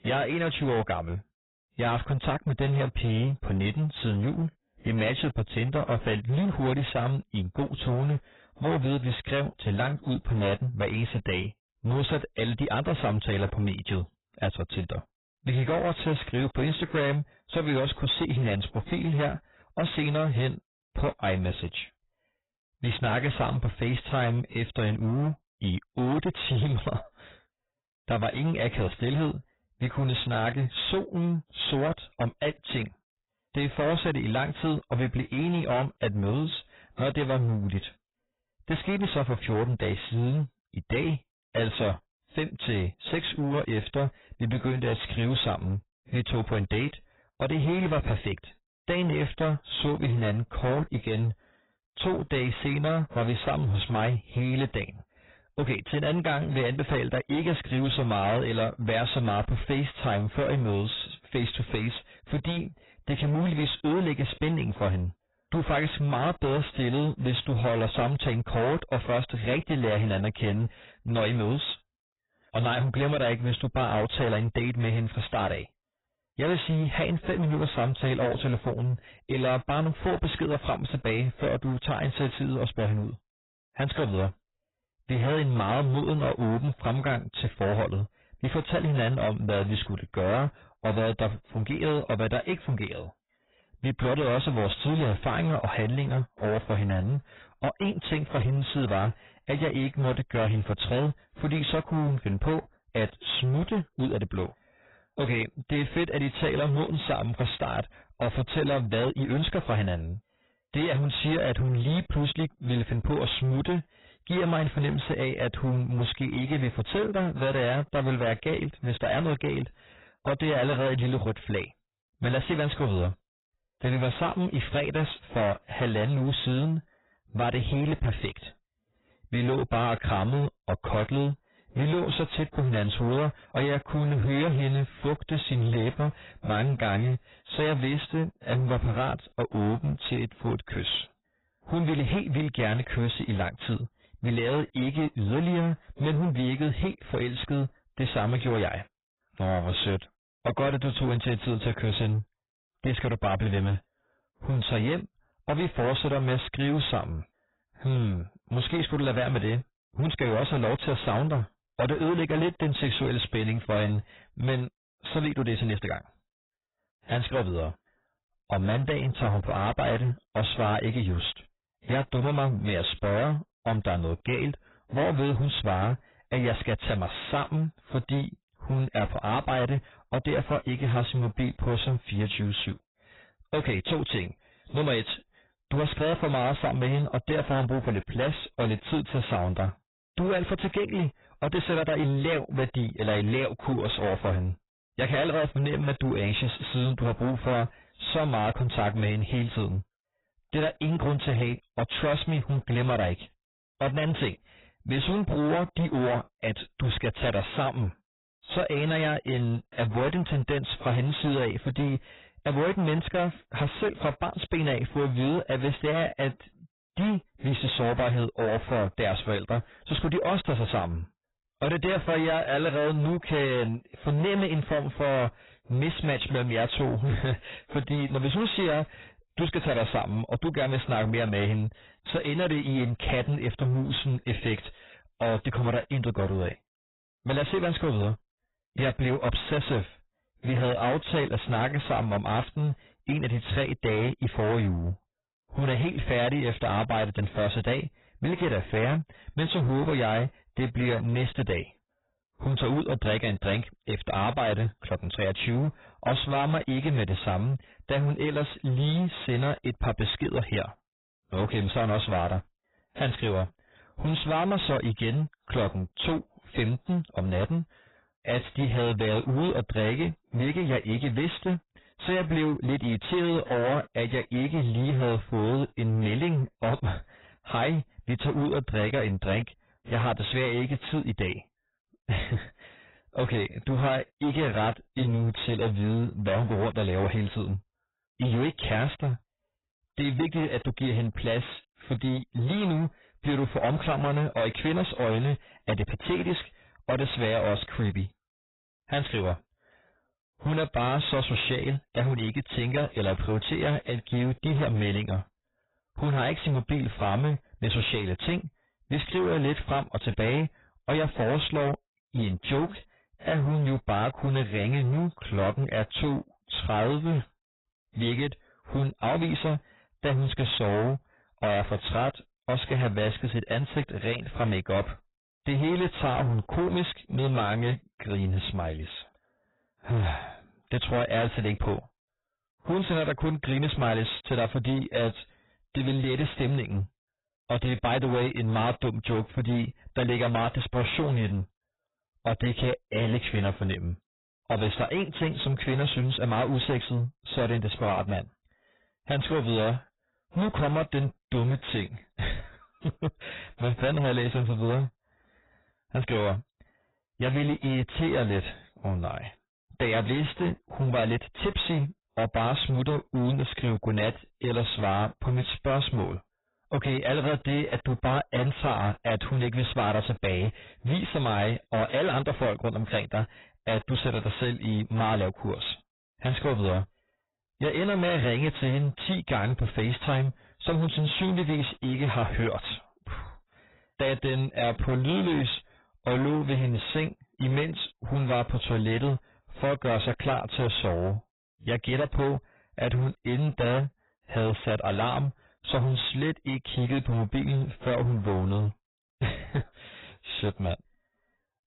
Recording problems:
distortion; heavy; 20% of the sound clipped
garbled, watery; badly; nothing above 4 kHz

